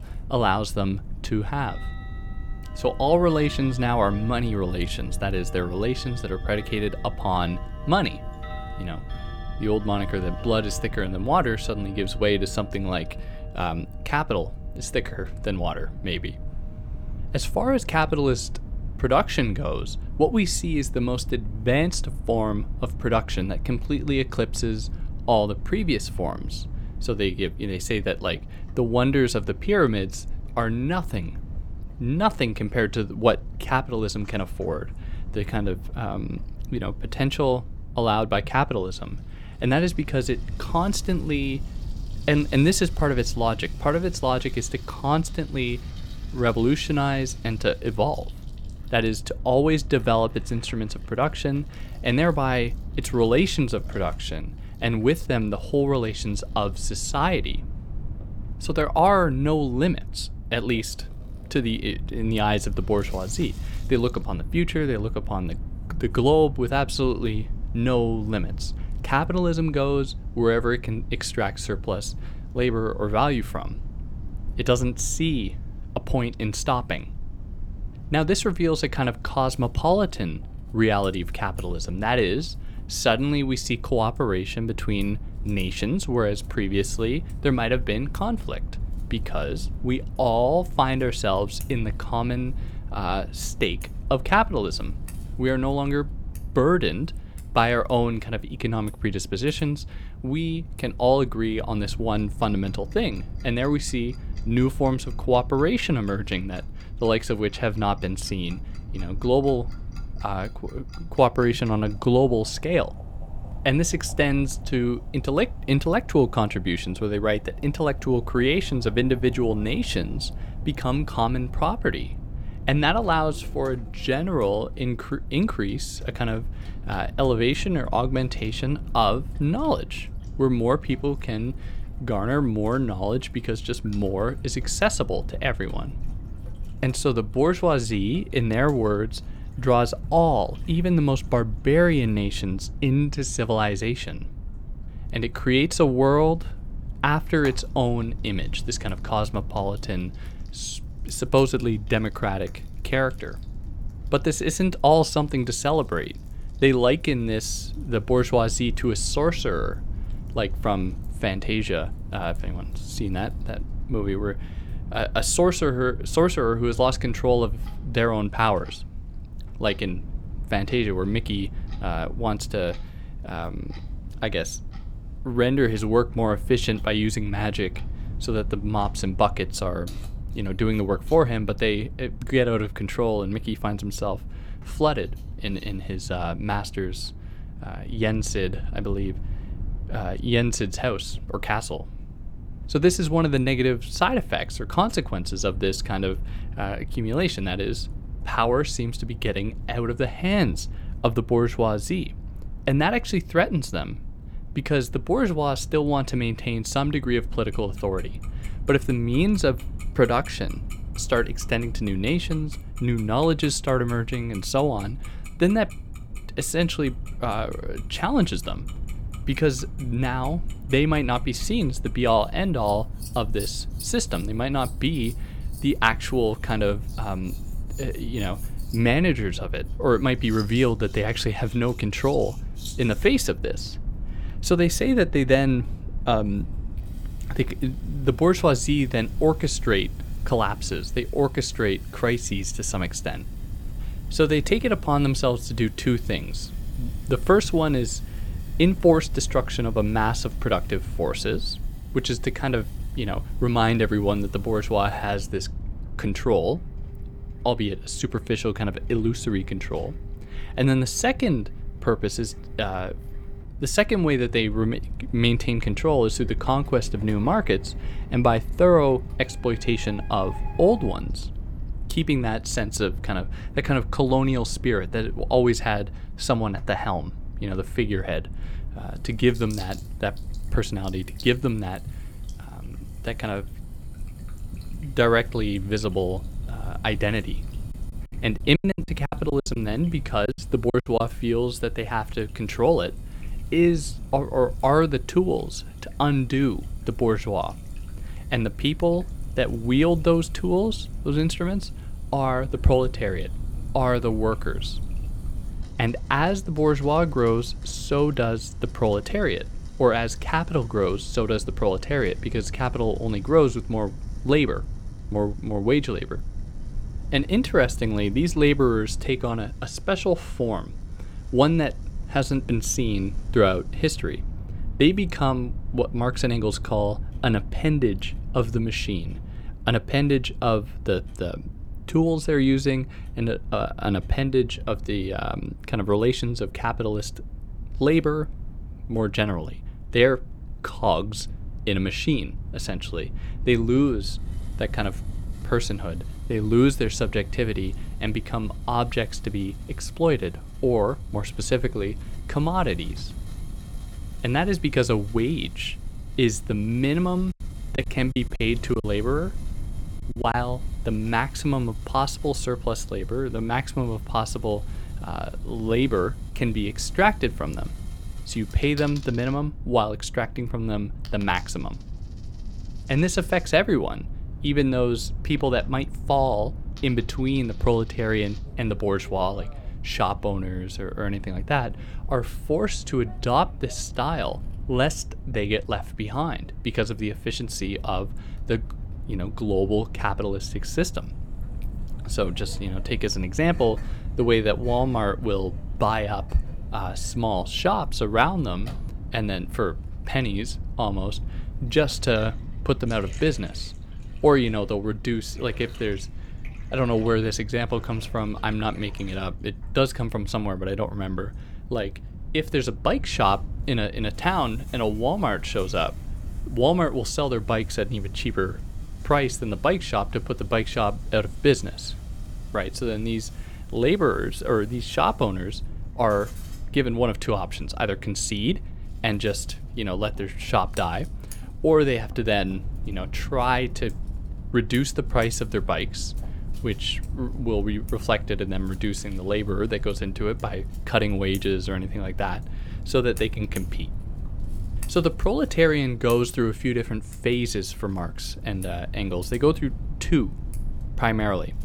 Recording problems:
household noises; faint; throughout; 25 dB below the speech
low rumble; faint; throughout; 25 dB below the speech
choppy; very; from 4:48 to 4:51 and from 5:58 to 6:00; 17% of the speech affected

